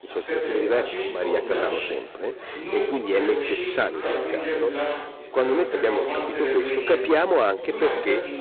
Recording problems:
phone-call audio; poor line; nothing above 4 kHz
distortion; slight; 15 dB below the speech
chatter from many people; loud; throughout; 3 dB below the speech

